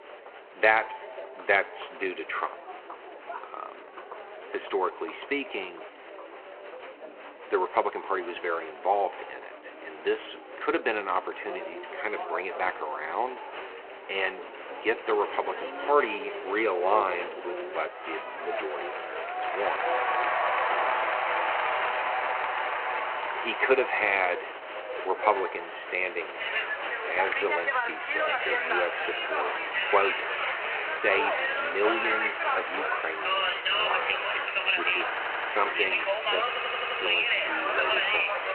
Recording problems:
echo of what is said; faint; throughout; 90 ms later, 20 dB below the speech
phone-call audio
crowd noise; very loud; throughout; 1 dB above the speech
audio stuttering; at 35 s and at 36 s

